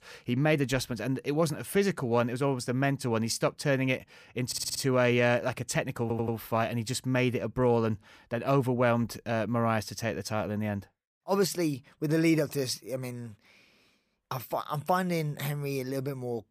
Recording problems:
audio stuttering; at 4.5 s and at 6 s

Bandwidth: 15 kHz